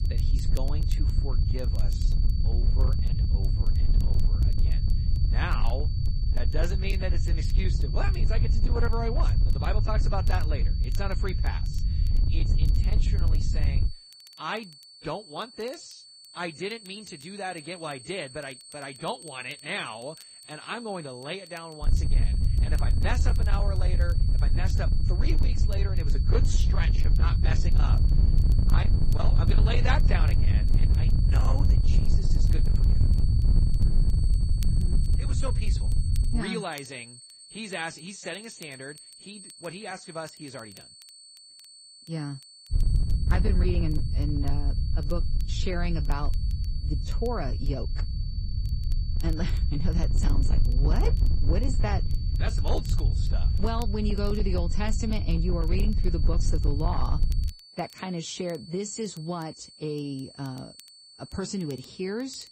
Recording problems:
distortion; slight; 9% of the sound clipped
garbled, watery; slightly; nothing above 8 kHz
low rumble; loud; until 14 s, from 22 to 36 s and from 43 to 58 s; 7 dB below the speech
high-pitched whine; noticeable; throughout; 4.5 kHz, 10 dB below the speech
crackle, like an old record; faint; 20 dB below the speech

